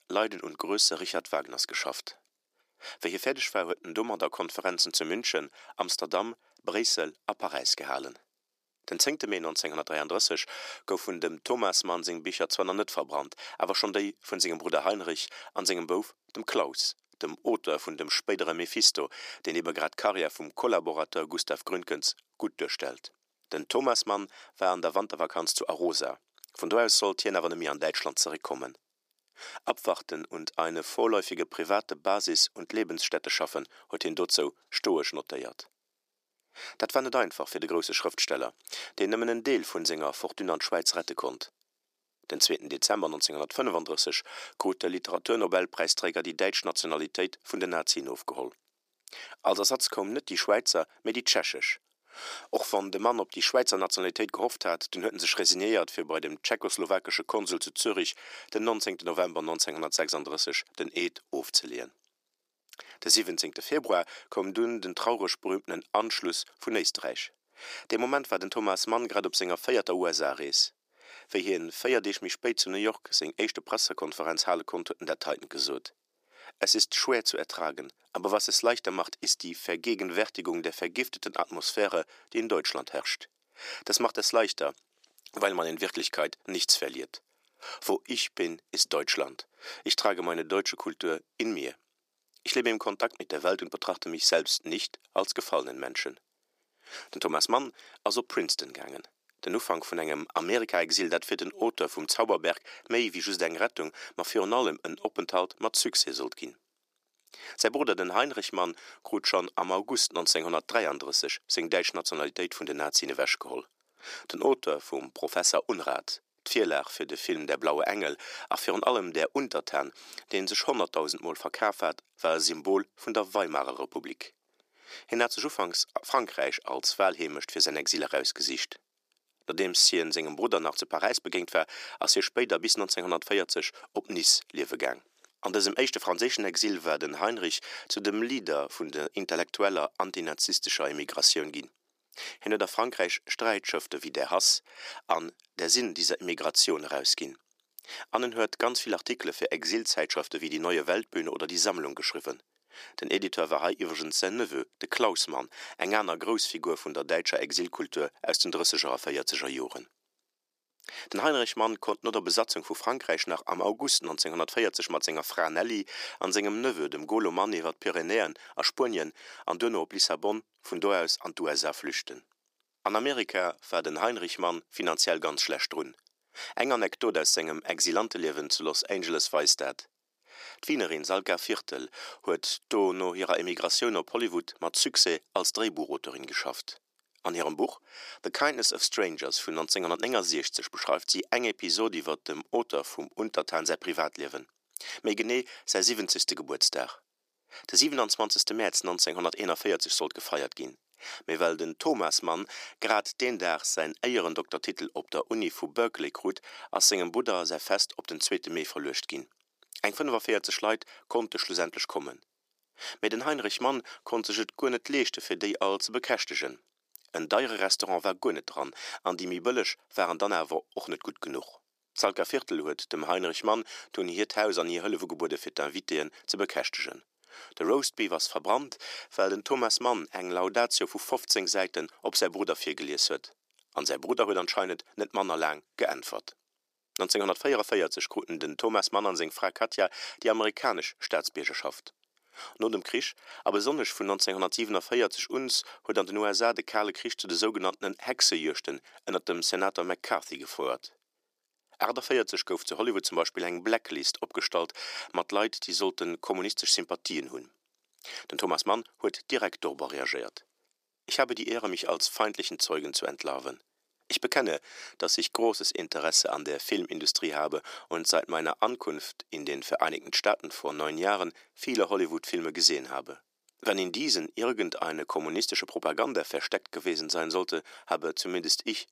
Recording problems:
thin; very; fading below 350 Hz

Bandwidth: 15 kHz